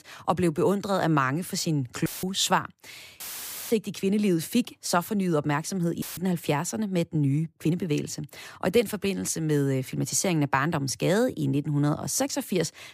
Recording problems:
audio cutting out; filled with static; at 2 s, at 3 s for 0.5 s and at 6 s
uneven, jittery; slightly; from 3 to 8 s

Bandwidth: 15 kHz